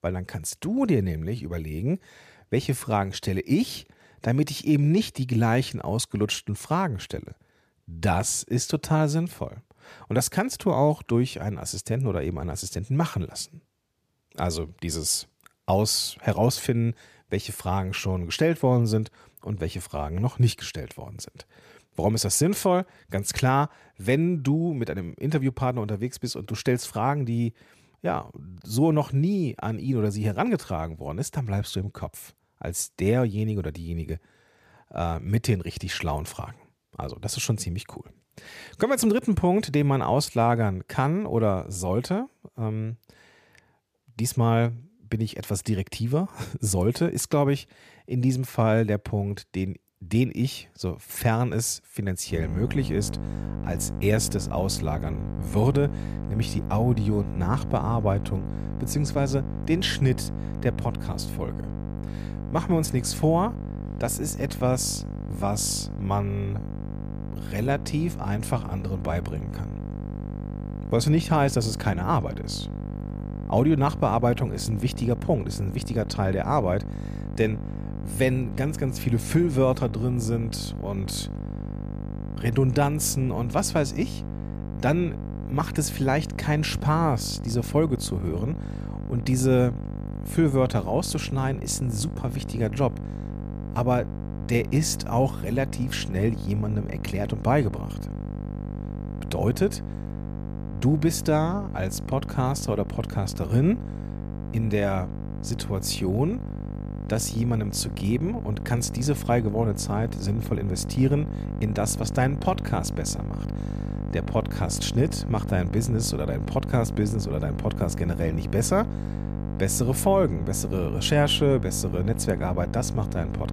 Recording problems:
electrical hum; noticeable; from 52 s on; 50 Hz, 10 dB below the speech

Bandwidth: 14.5 kHz